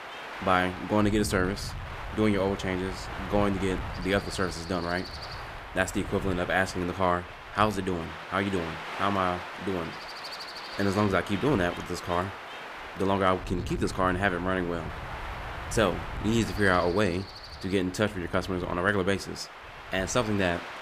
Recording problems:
wind noise on the microphone; heavy; 9 dB below the speech

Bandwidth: 15 kHz